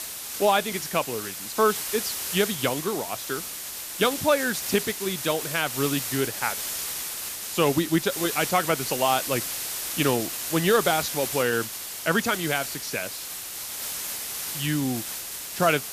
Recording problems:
hiss; loud; throughout; 4 dB below the speech

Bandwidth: 14.5 kHz